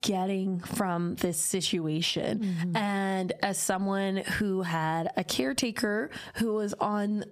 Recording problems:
squashed, flat; heavily

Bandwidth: 15 kHz